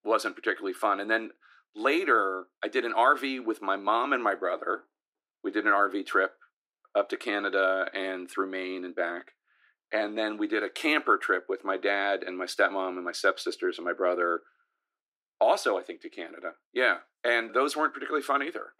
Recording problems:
thin; somewhat; fading below 300 Hz

